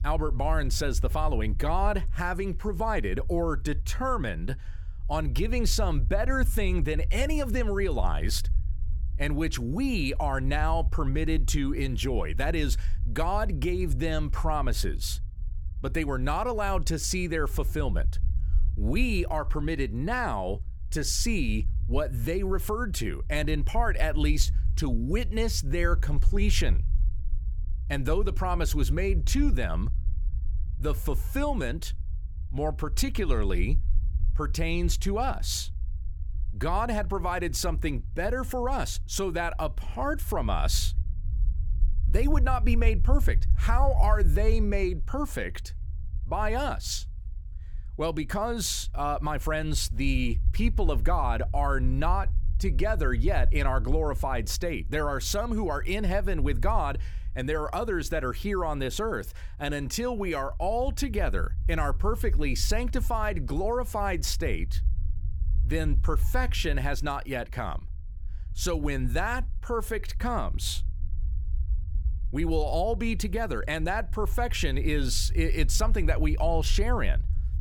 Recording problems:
low rumble; faint; throughout; 20 dB below the speech

